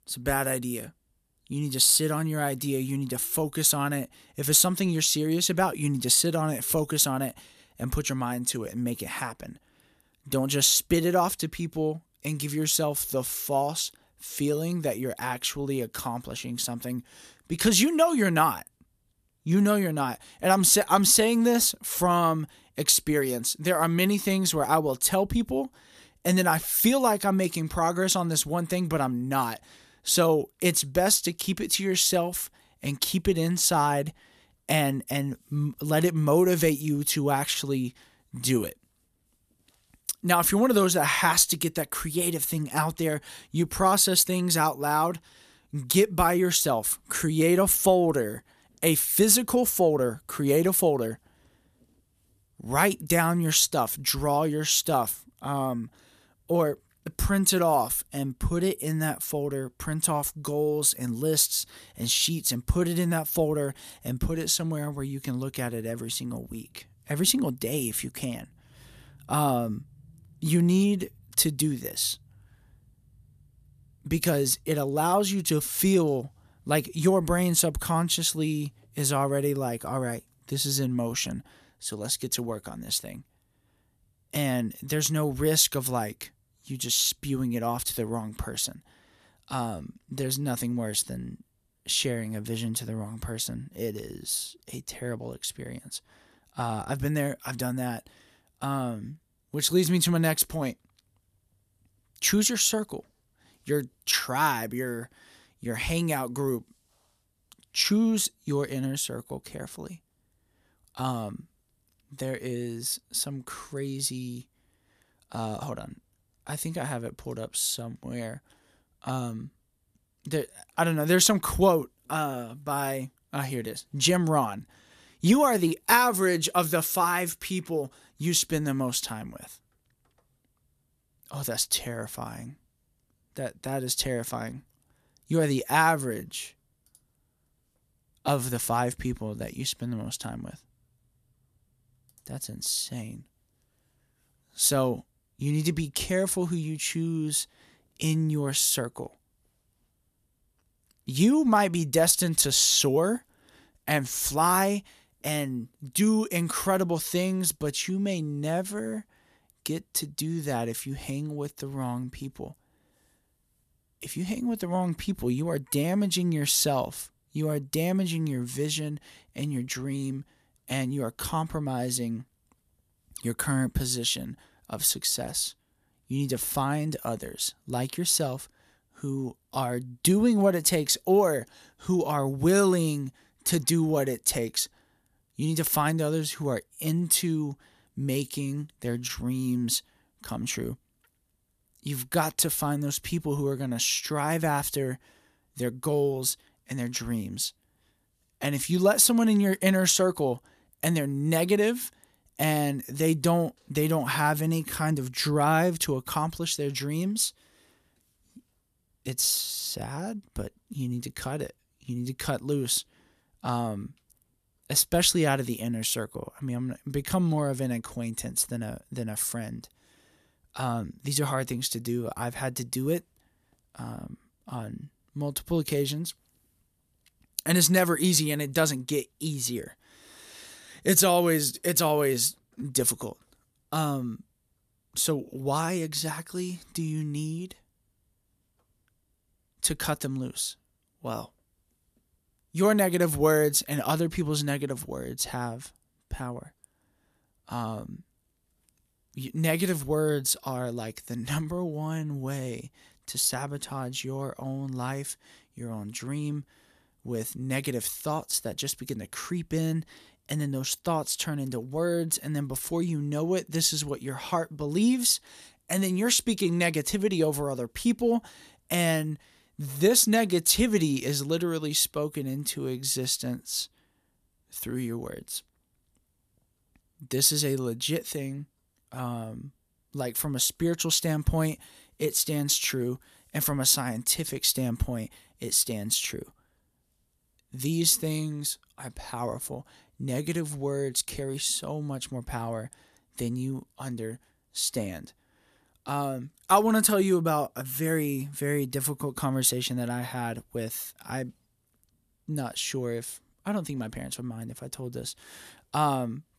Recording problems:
none

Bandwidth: 14.5 kHz